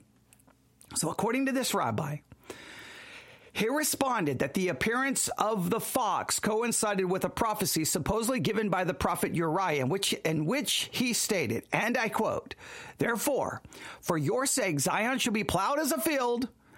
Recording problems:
squashed, flat; heavily

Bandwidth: 16 kHz